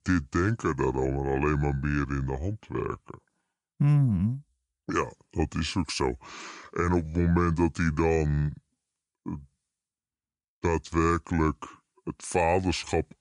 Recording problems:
wrong speed and pitch; too slow and too low; 0.7 times normal speed

